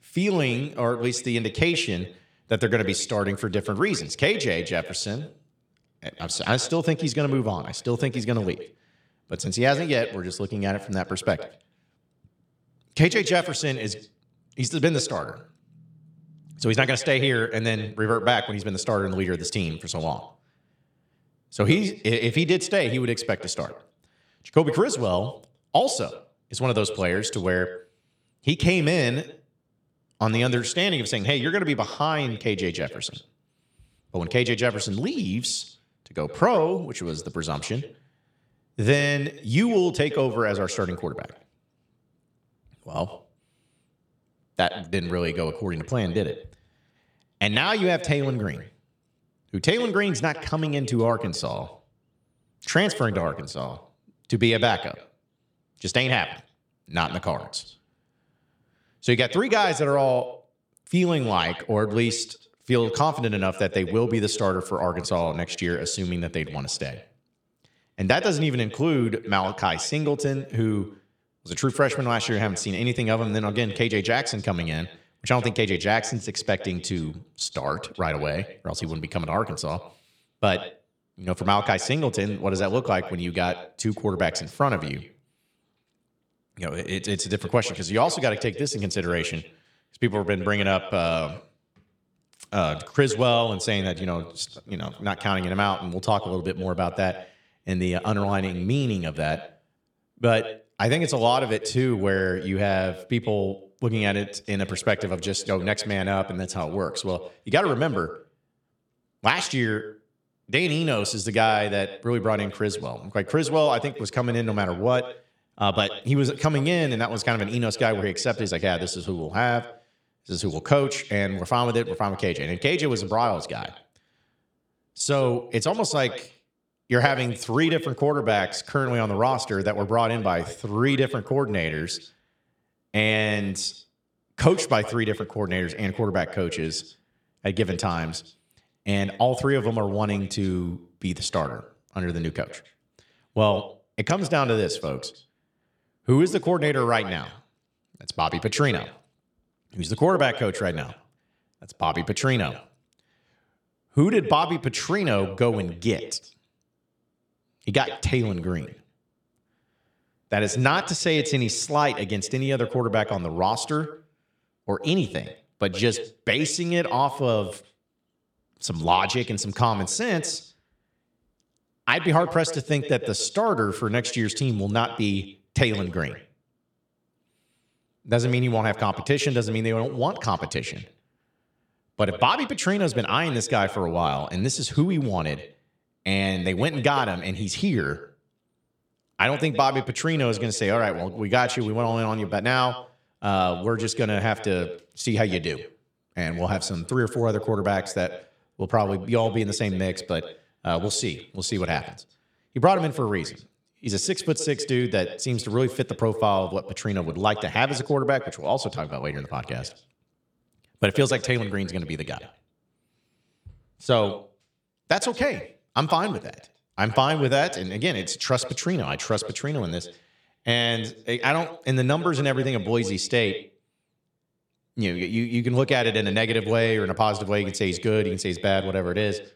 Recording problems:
echo of what is said; noticeable; throughout; 110 ms later, 15 dB below the speech

